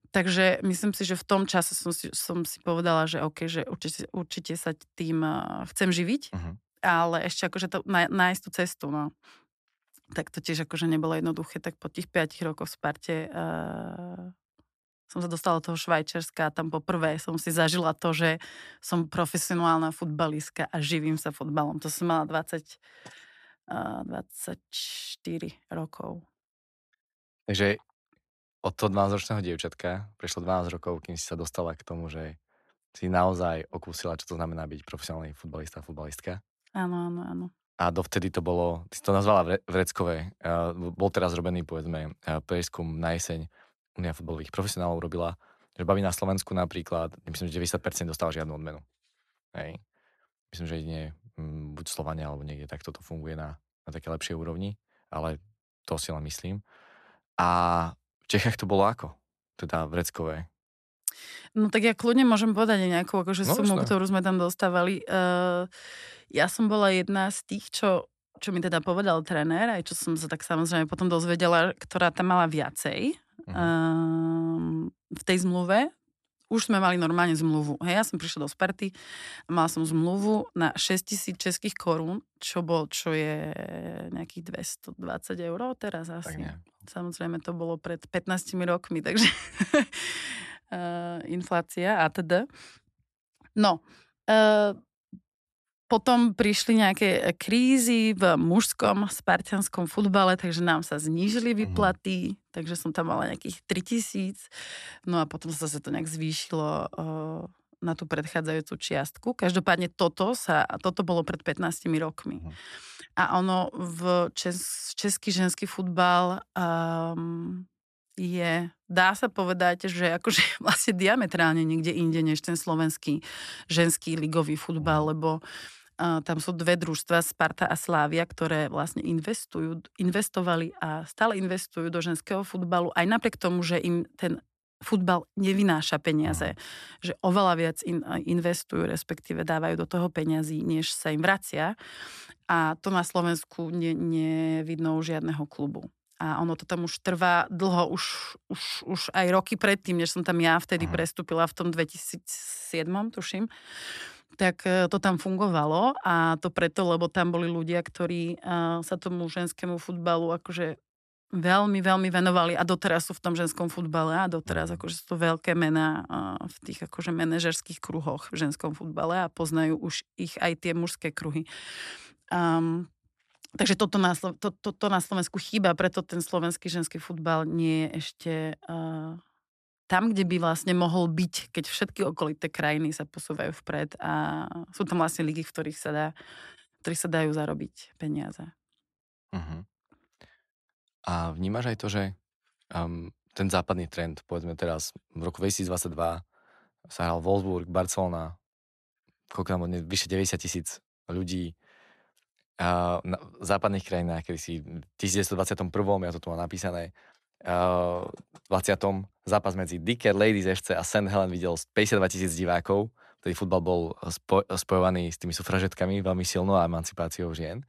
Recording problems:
none

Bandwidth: 13.5 kHz